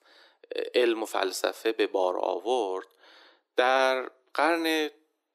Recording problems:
thin; very; fading below 300 Hz

